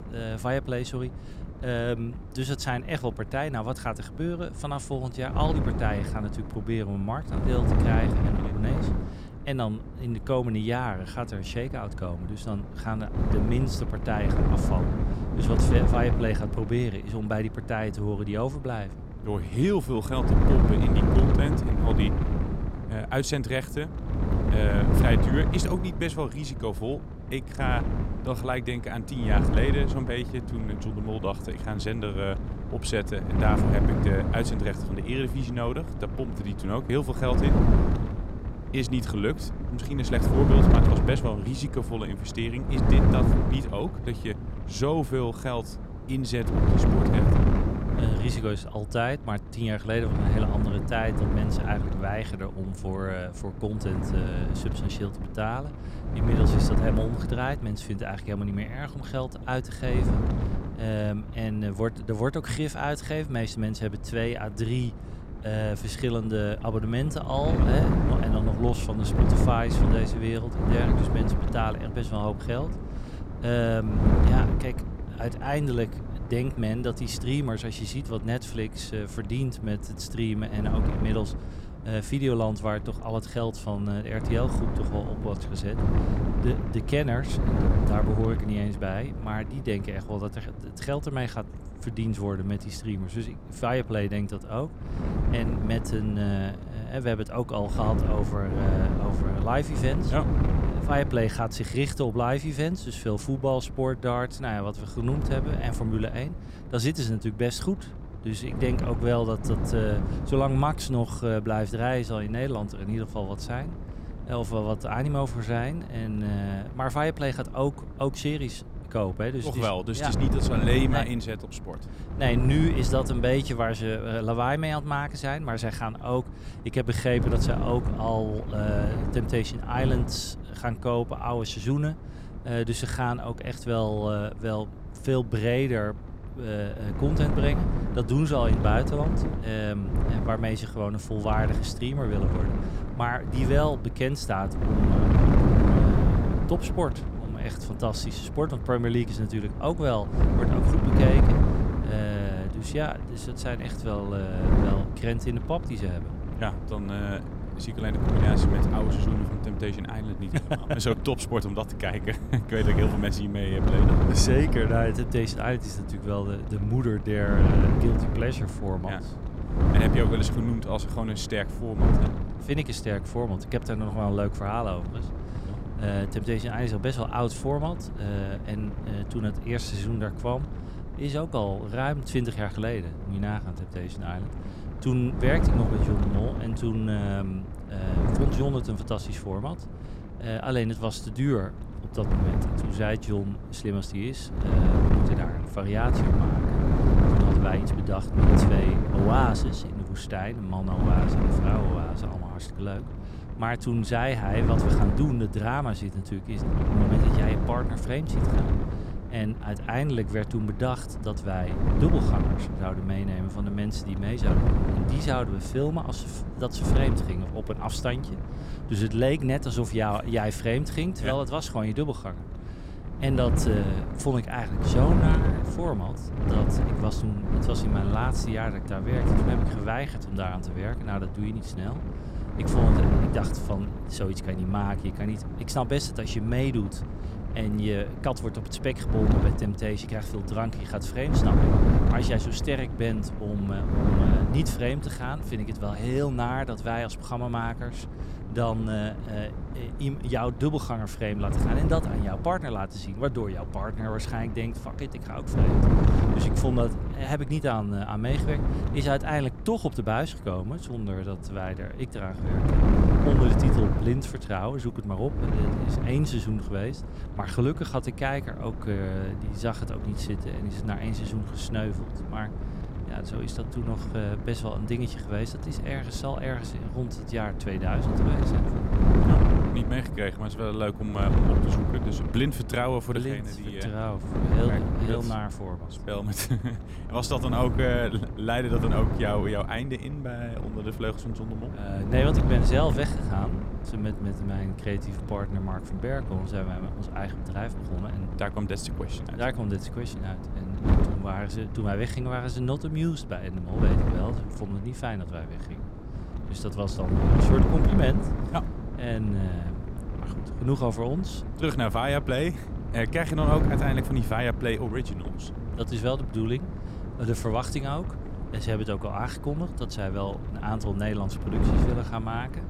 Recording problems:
wind noise on the microphone; heavy; 4 dB below the speech

